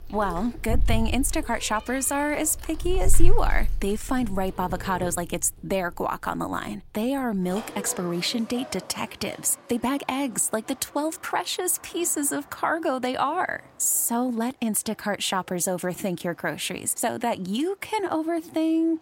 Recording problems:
animal sounds; loud; throughout; 7 dB below the speech
uneven, jittery; strongly; from 0.5 to 18 s

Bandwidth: 16 kHz